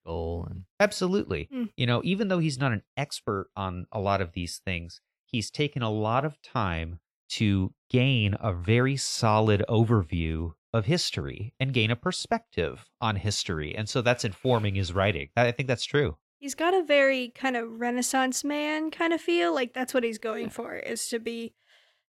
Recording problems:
none

